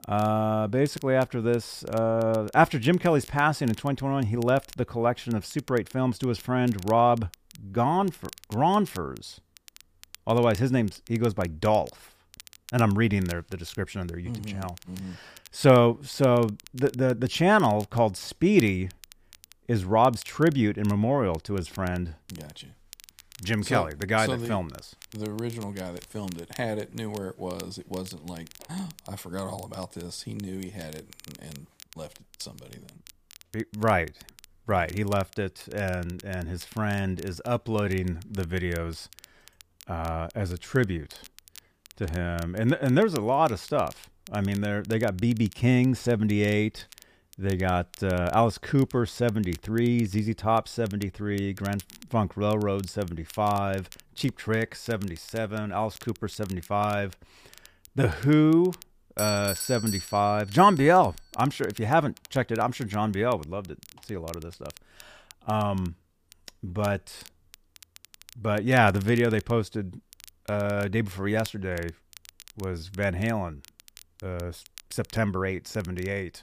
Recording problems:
crackle, like an old record; faint; 25 dB below the speech
doorbell; noticeable; from 59 s to 1:01; peak 3 dB below the speech

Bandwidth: 15 kHz